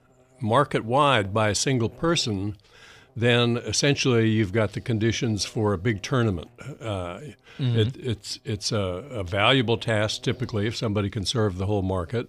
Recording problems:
electrical hum; faint; throughout; 60 Hz, 30 dB below the speech

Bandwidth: 15 kHz